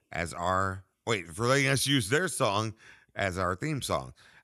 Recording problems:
none

